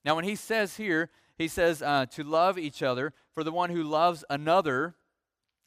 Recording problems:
none

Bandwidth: 15 kHz